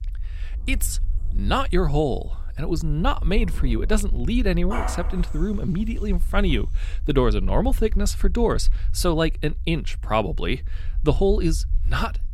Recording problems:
animal sounds; noticeable; until 6.5 s; 15 dB below the speech
low rumble; faint; throughout; 25 dB below the speech

